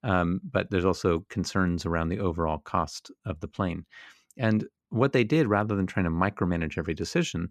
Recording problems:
none

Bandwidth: 14 kHz